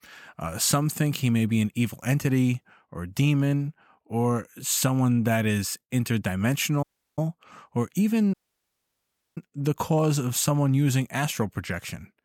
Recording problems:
audio cutting out; at 7 s and at 8.5 s for 1 s

